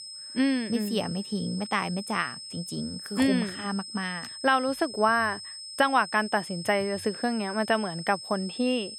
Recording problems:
high-pitched whine; noticeable; throughout; 5 kHz, 10 dB below the speech

